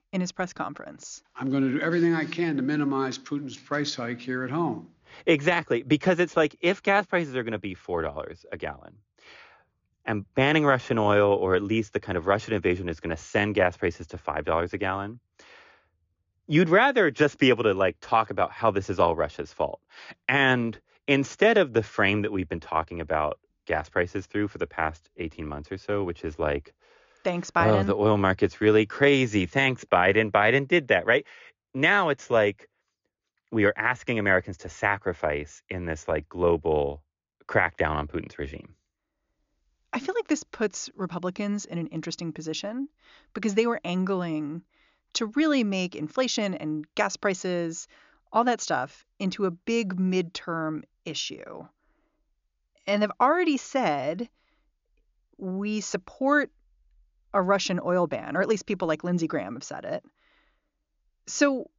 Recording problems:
high frequencies cut off; noticeable; nothing above 7 kHz

